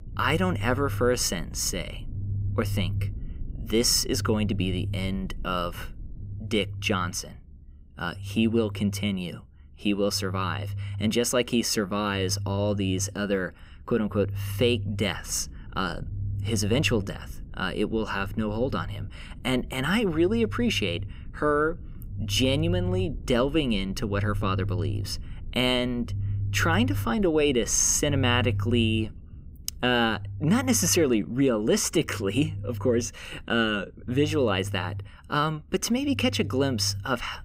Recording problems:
low rumble; faint; throughout; 20 dB below the speech

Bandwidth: 15.5 kHz